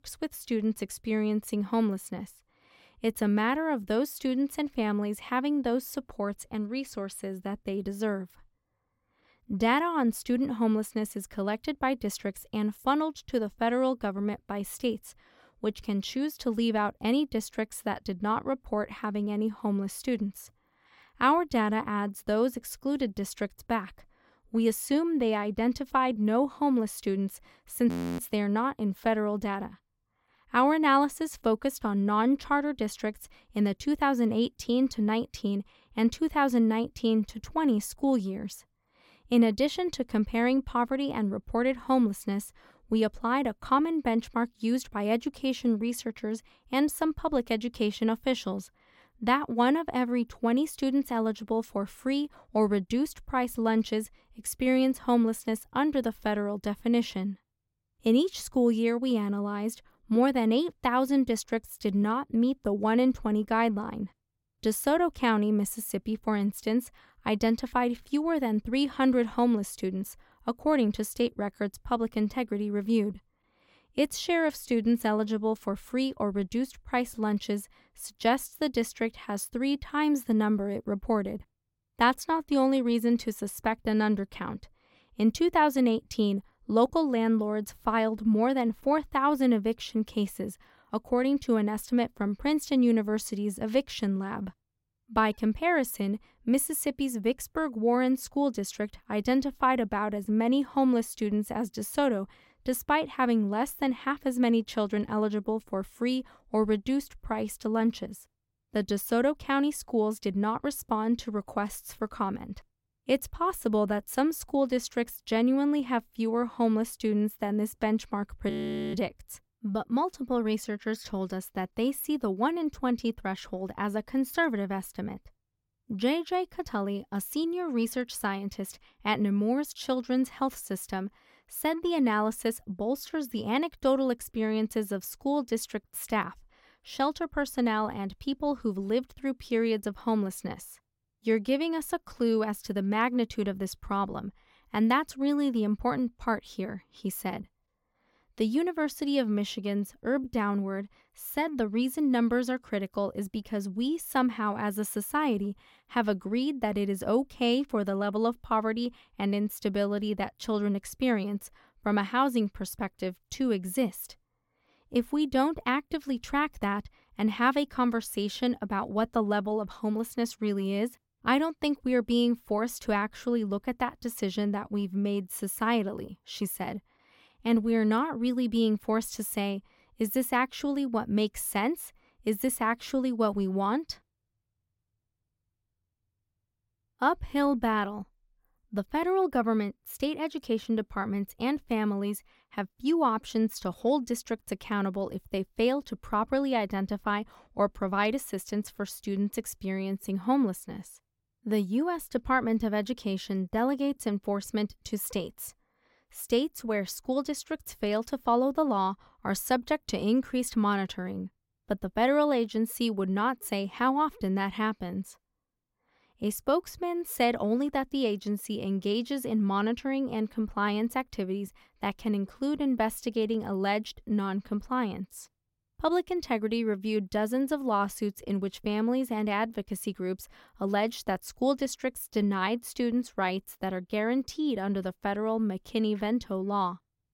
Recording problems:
audio freezing; at 28 s and at 1:59

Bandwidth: 16.5 kHz